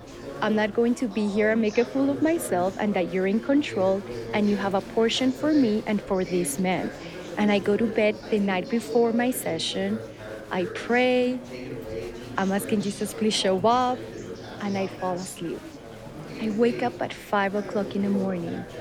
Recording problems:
chatter from many people; noticeable; throughout; 10 dB below the speech

